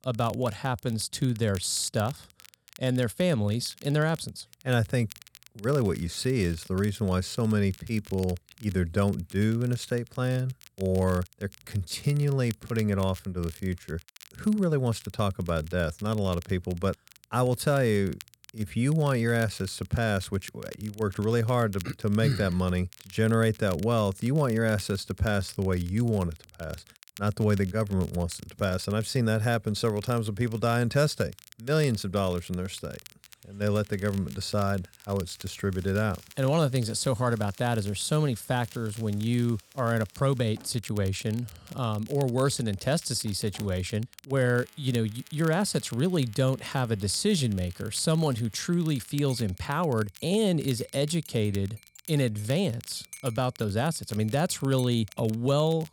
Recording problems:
household noises; faint; from 33 s on; 25 dB below the speech
crackle, like an old record; faint; 20 dB below the speech

